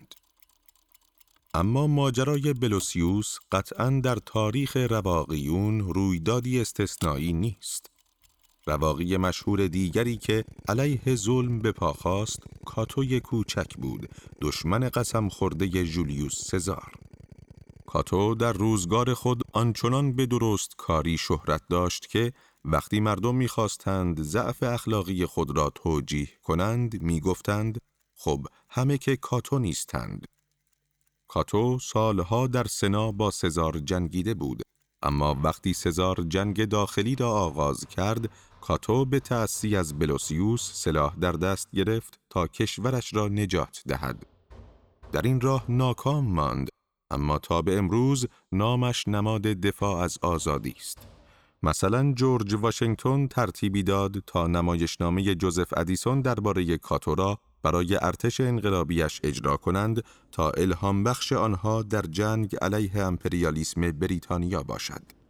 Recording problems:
machinery noise; faint; throughout; 25 dB below the speech

